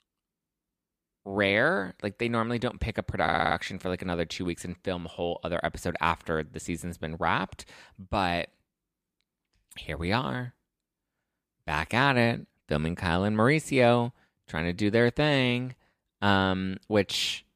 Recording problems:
audio stuttering; at 3 s

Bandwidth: 15 kHz